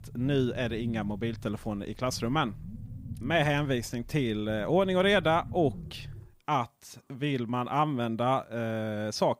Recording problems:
low rumble; faint; until 6.5 s; 25 dB below the speech

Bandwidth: 15.5 kHz